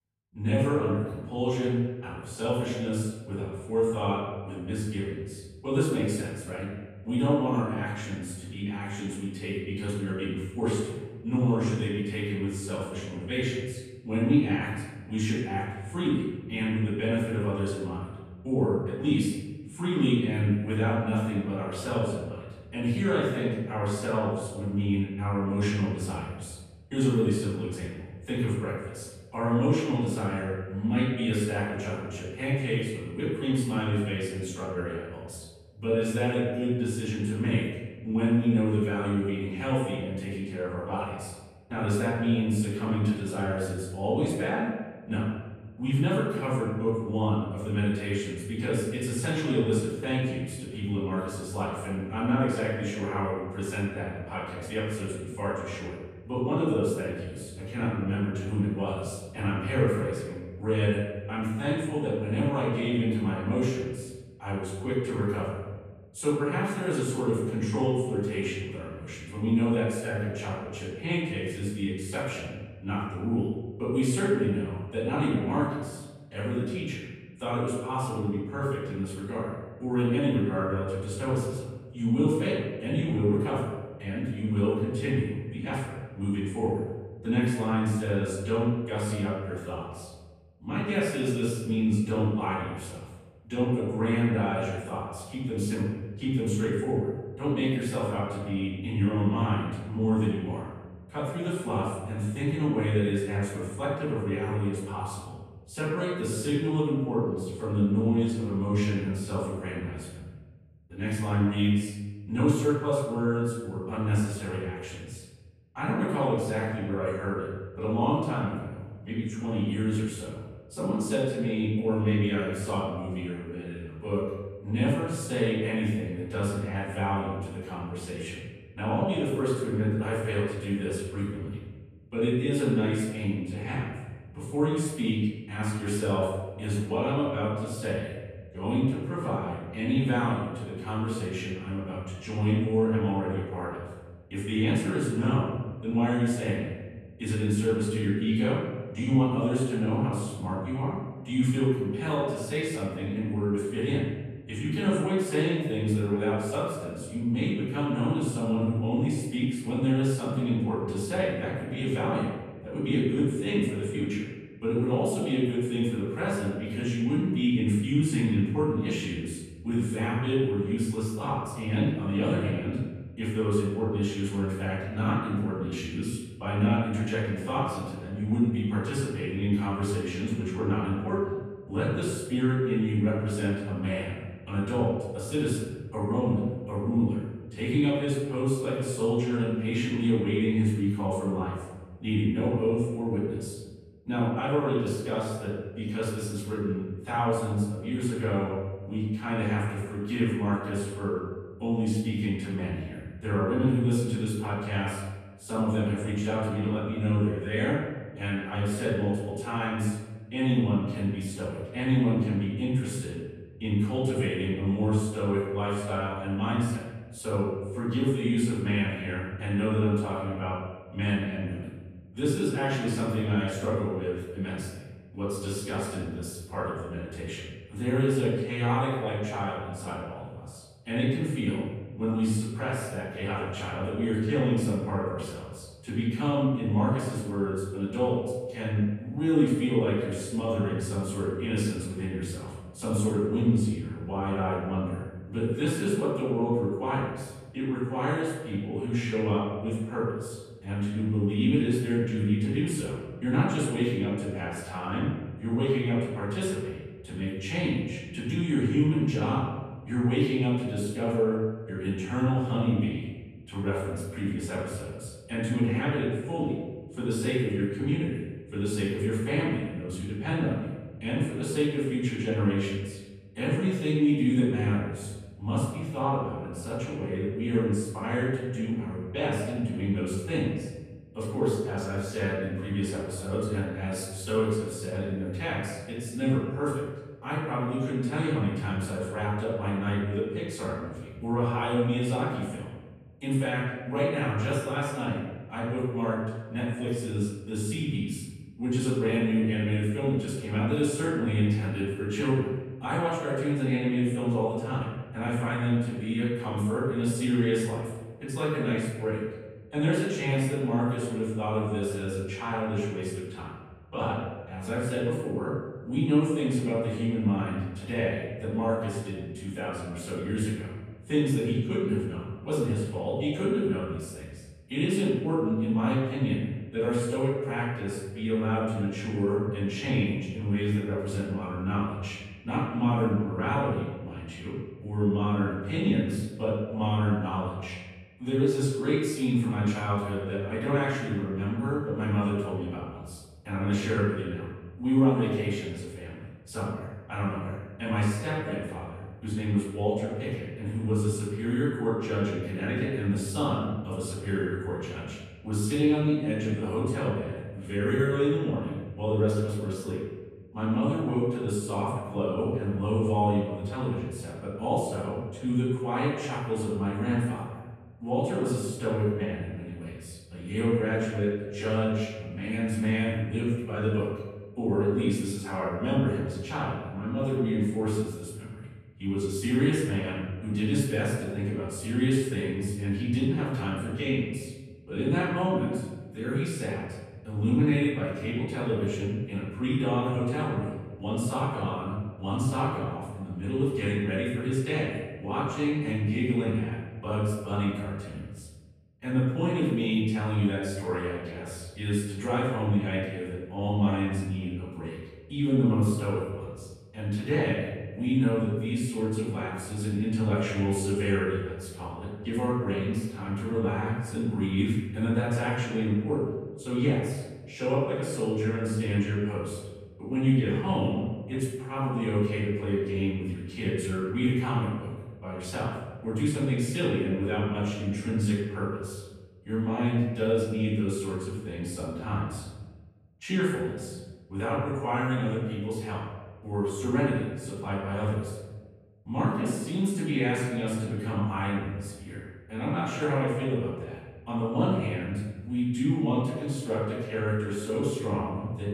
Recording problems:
room echo; strong; dies away in 1.2 s
off-mic speech; far

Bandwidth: 14.5 kHz